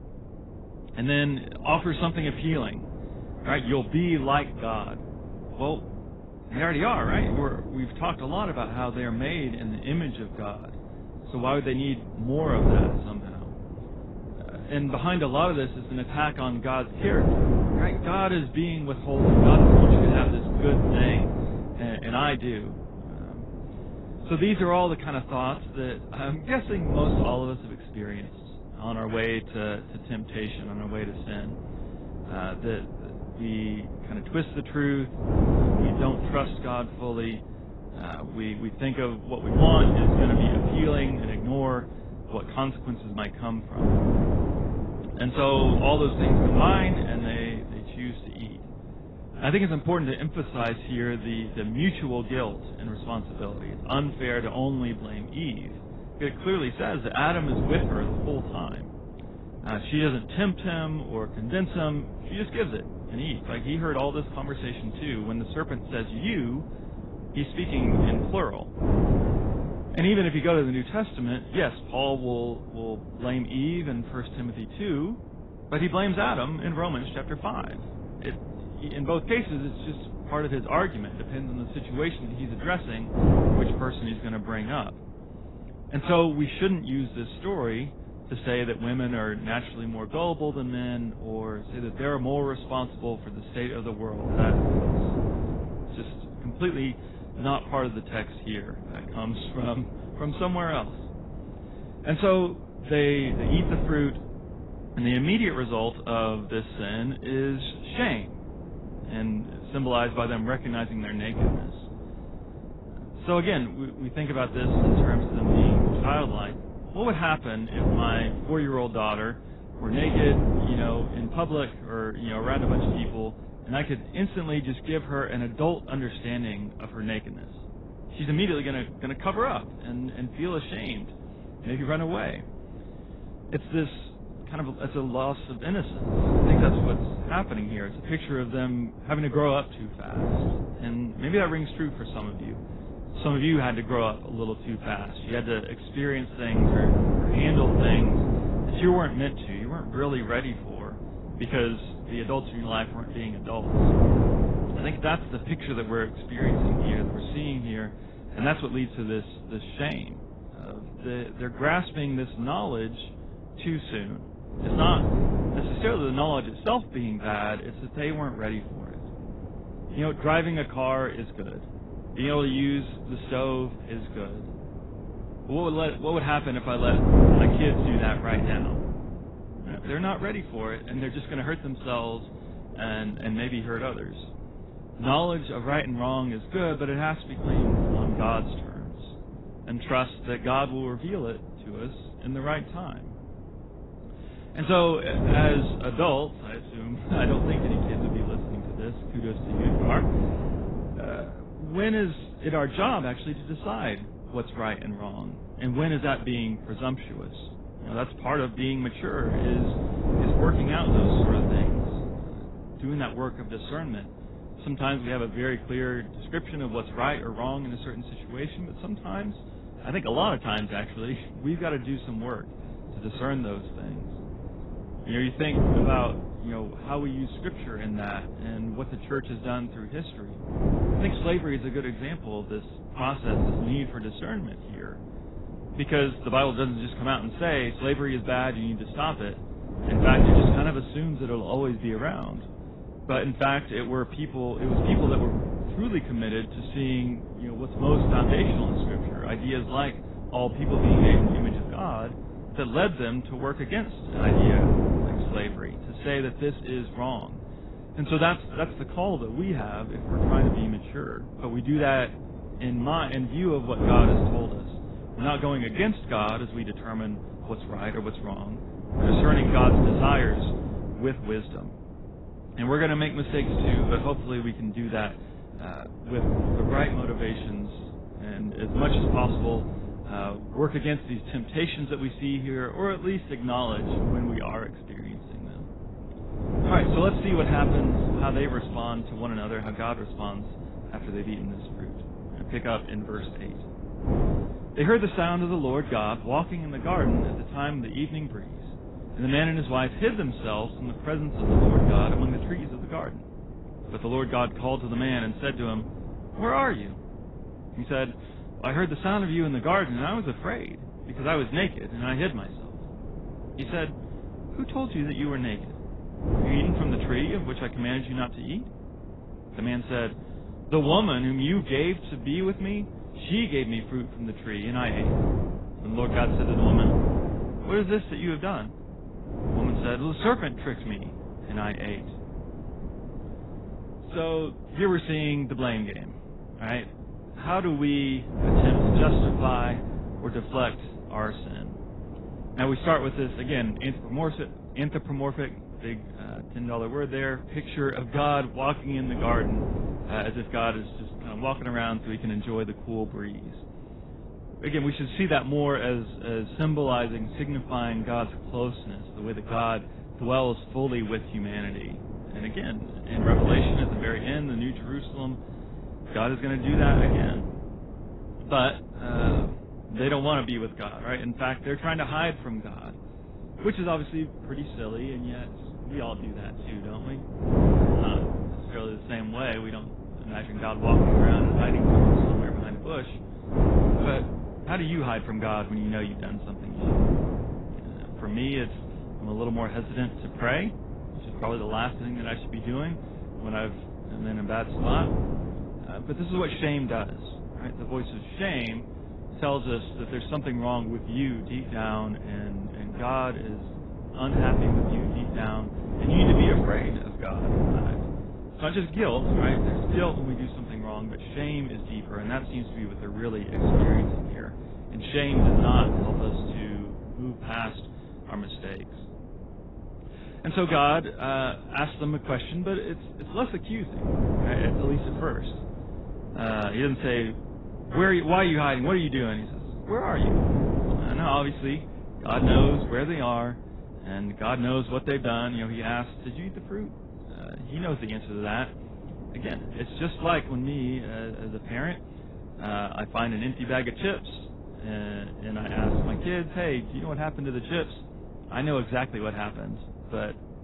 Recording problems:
garbled, watery; badly; nothing above 4 kHz
wind noise on the microphone; heavy; 5 dB below the speech

